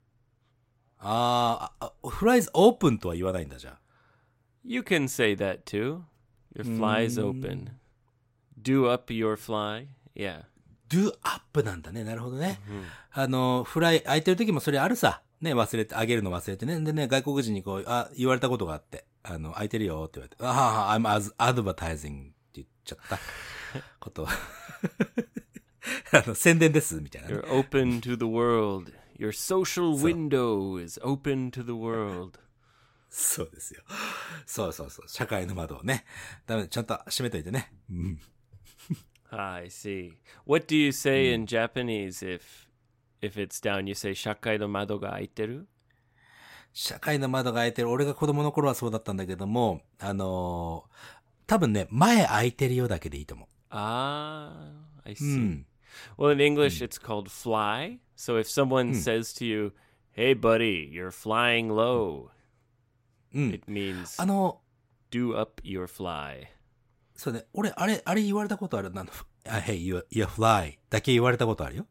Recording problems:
none

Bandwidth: 16 kHz